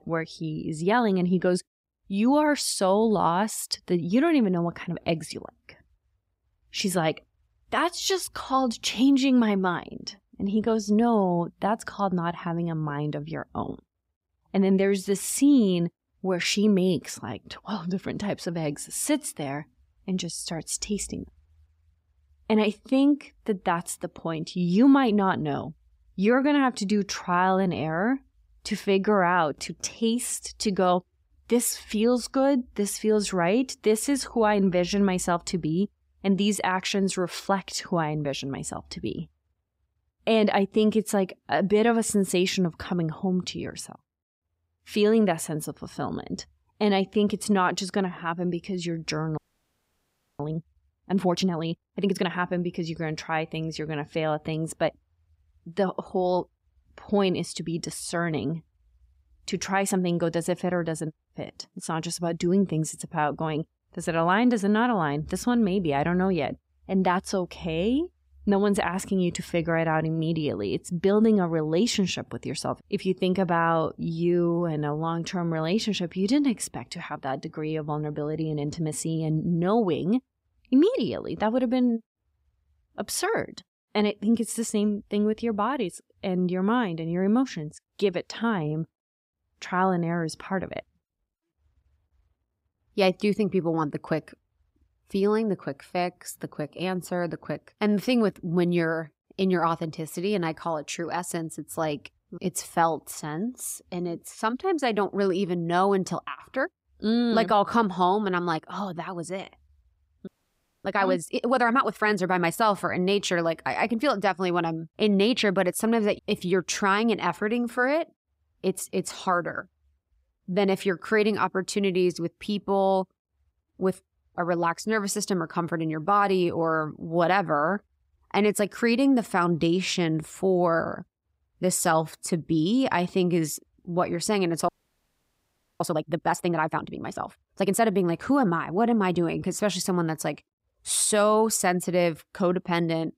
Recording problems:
audio freezing; at 49 s for 1 s, at 1:50 for 0.5 s and at 2:15 for 1 s

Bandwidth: 15.5 kHz